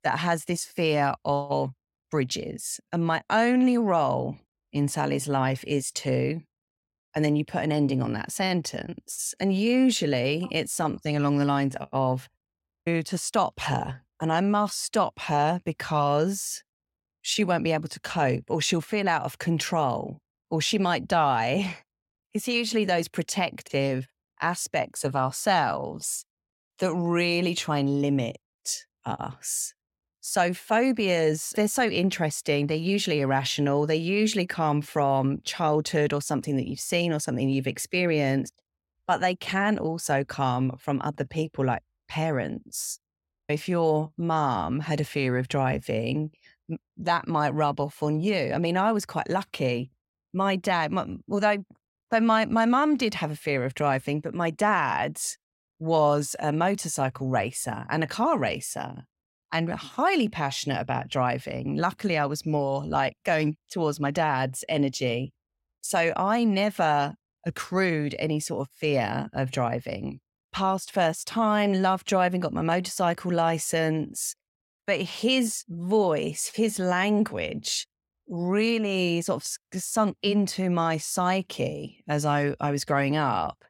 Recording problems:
none

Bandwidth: 16.5 kHz